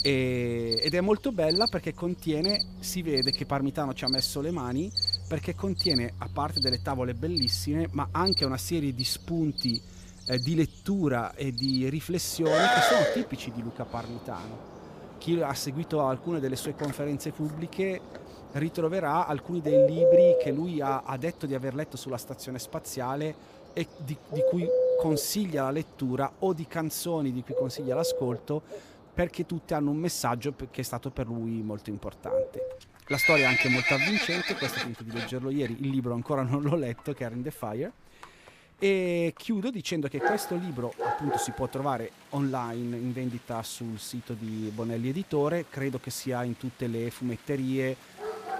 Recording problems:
animal sounds; very loud; throughout; 3 dB above the speech

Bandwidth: 15 kHz